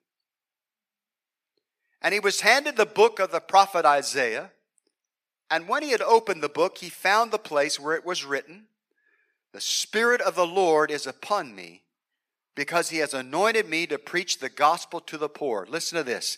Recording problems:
thin; very; fading below 550 Hz

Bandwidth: 14.5 kHz